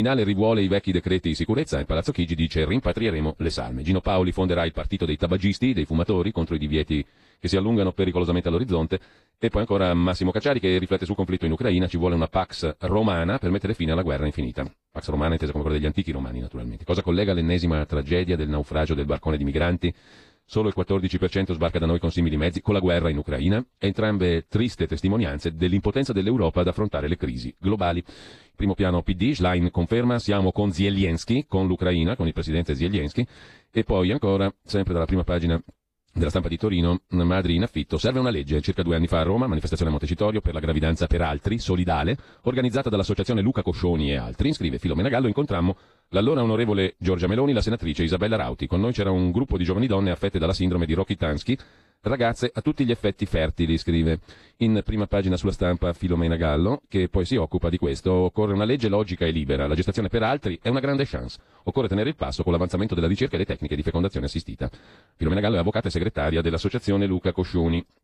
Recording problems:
wrong speed, natural pitch; too fast; 1.5 times normal speed
garbled, watery; slightly
abrupt cut into speech; at the start

